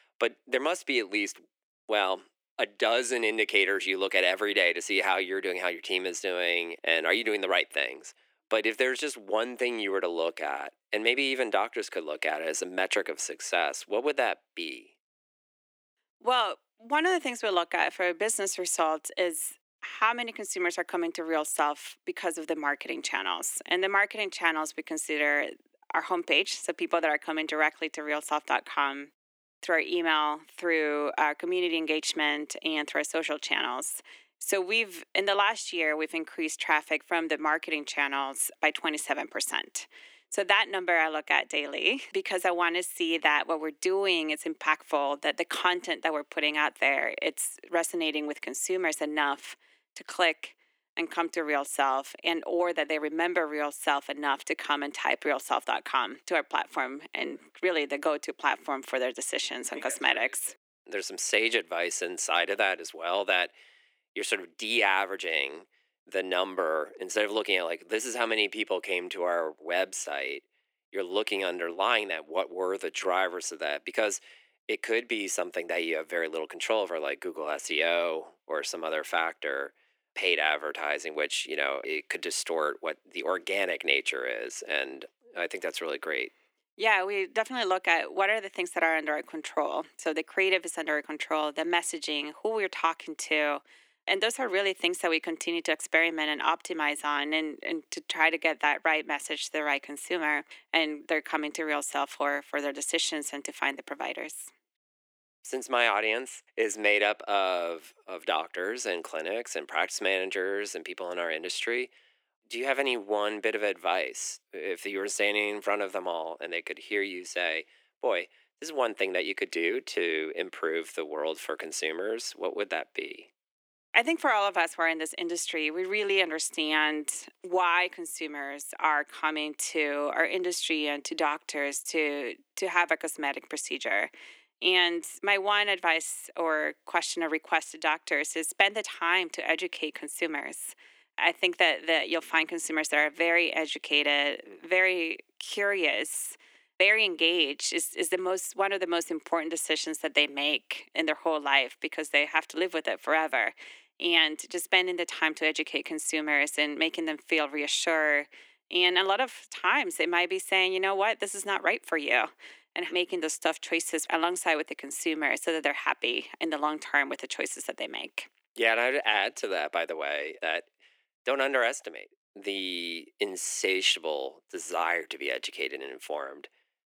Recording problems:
thin; very; fading below 350 Hz

